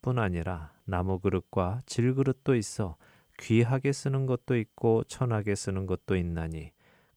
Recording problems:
none

